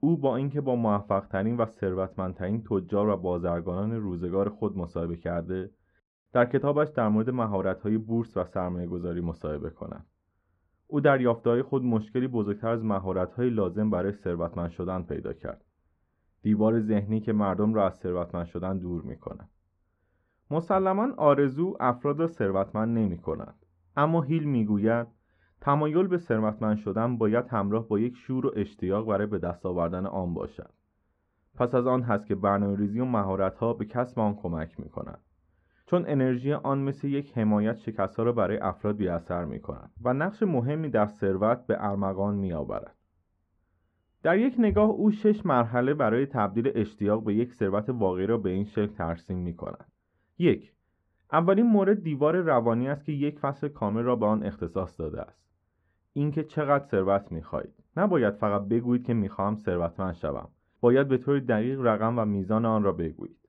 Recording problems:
muffled; very; fading above 1 kHz

